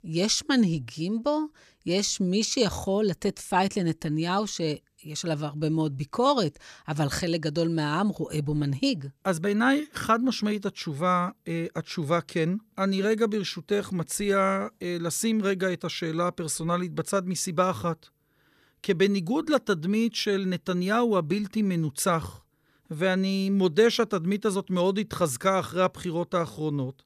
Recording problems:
none

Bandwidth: 14.5 kHz